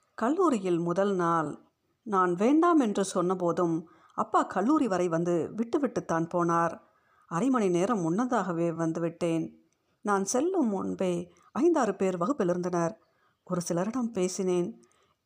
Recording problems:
uneven, jittery; strongly; from 1 to 14 s

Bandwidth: 15 kHz